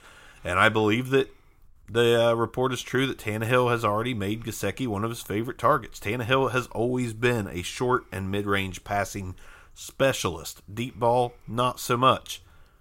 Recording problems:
none

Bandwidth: 16 kHz